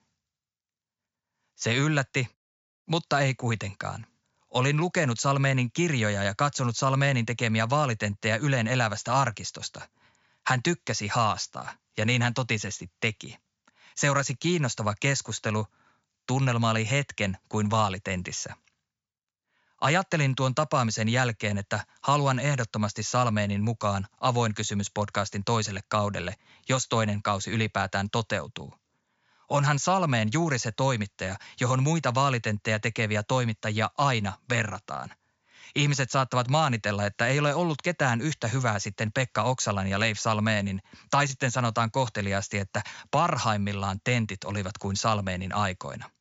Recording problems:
high frequencies cut off; noticeable; nothing above 7.5 kHz

